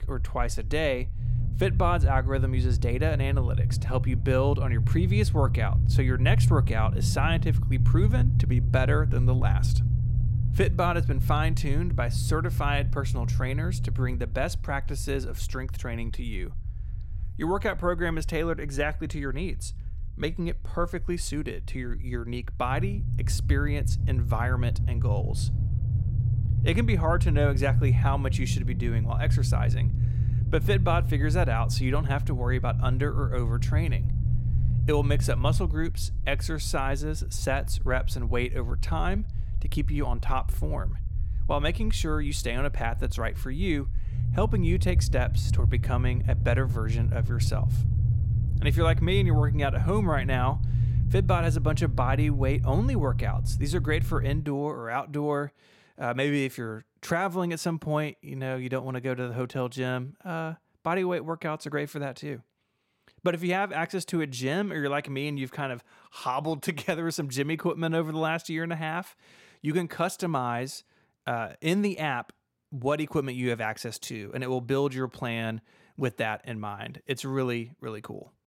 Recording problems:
low rumble; loud; until 54 s; 10 dB below the speech

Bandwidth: 16.5 kHz